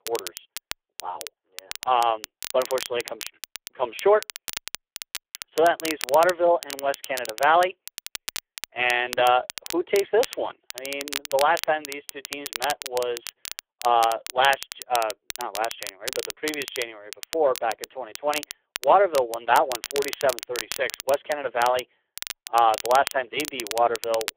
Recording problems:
phone-call audio; poor line
crackle, like an old record; noticeable; 10 dB below the speech

